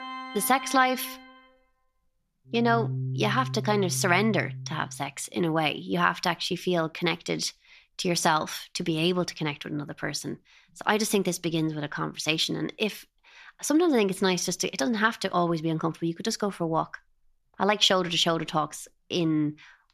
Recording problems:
background music; loud; until 5 s; 9 dB below the speech

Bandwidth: 14 kHz